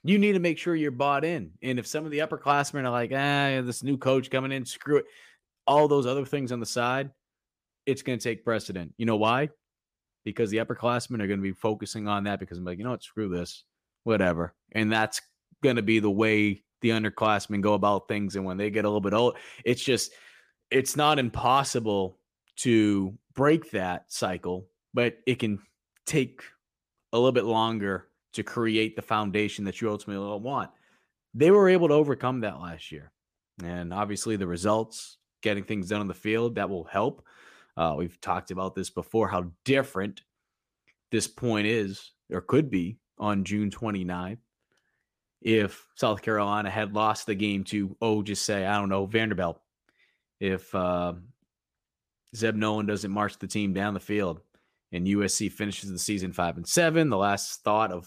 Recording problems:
none

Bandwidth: 15 kHz